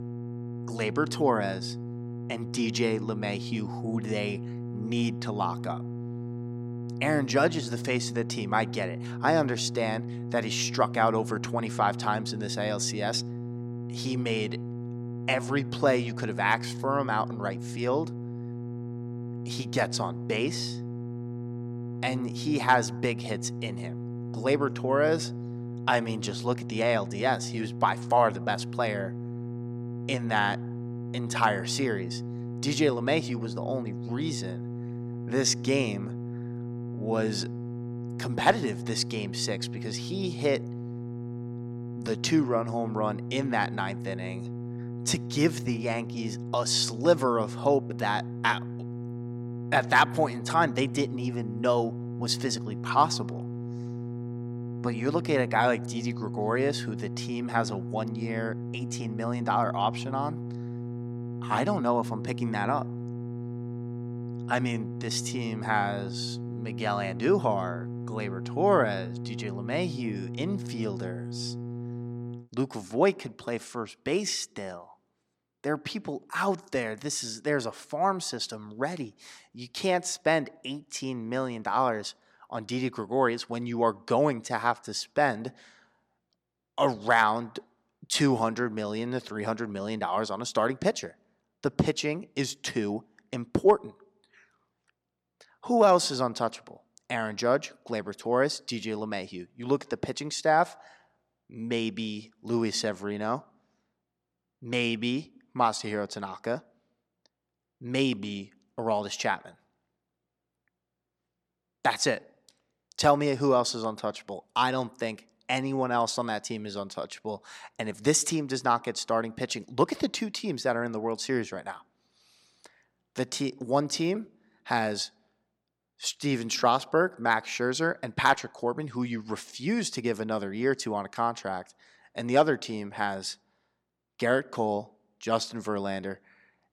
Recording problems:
electrical hum; noticeable; until 1:12; 60 Hz, 15 dB below the speech

